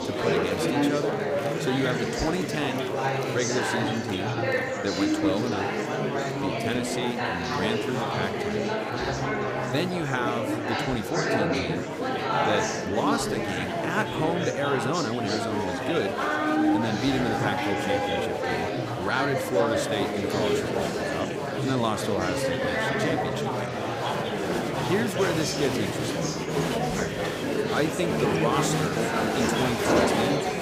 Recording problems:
murmuring crowd; very loud; throughout; 3 dB above the speech

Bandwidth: 15.5 kHz